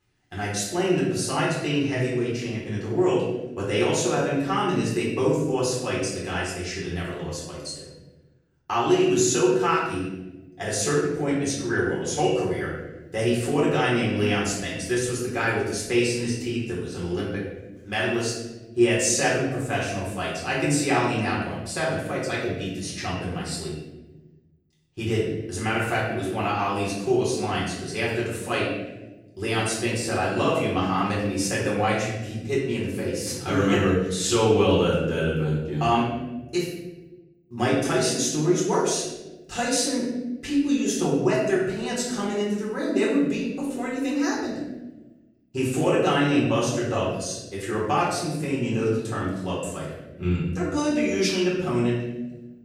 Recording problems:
off-mic speech; far
room echo; noticeable; dies away in 1 s

